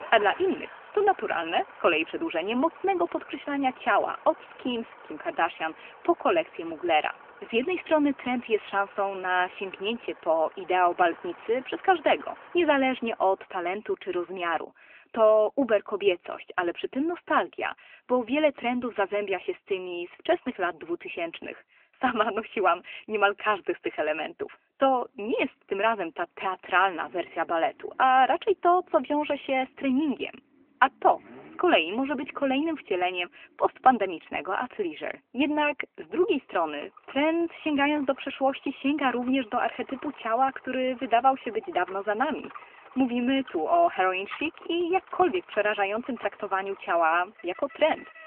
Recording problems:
phone-call audio; nothing above 3 kHz
traffic noise; faint; throughout; 20 dB below the speech

